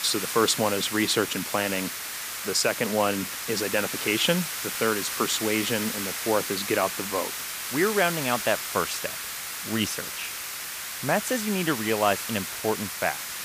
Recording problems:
hiss; loud; throughout; 4 dB below the speech

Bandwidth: 15 kHz